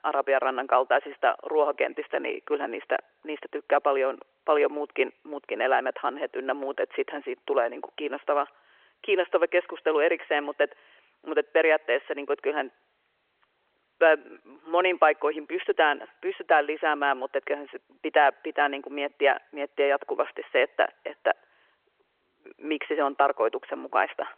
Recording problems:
phone-call audio

